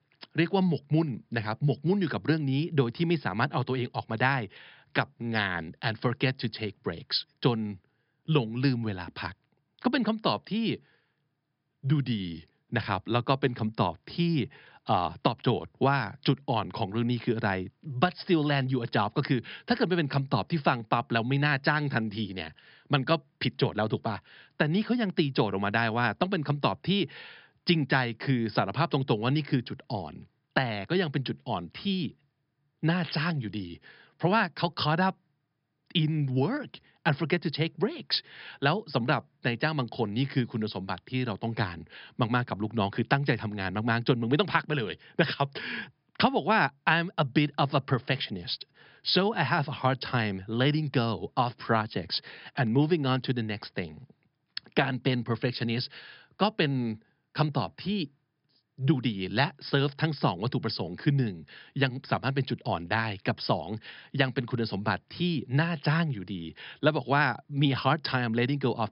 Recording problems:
high frequencies cut off; noticeable; nothing above 5.5 kHz

